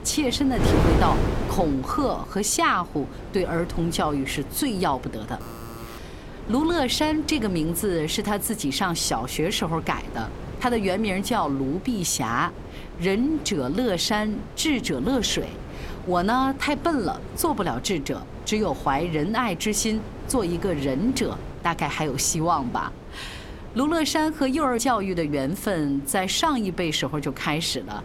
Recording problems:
wind noise on the microphone; occasional gusts; 15 dB below the speech
alarm; faint; at 5.5 s; peak 15 dB below the speech

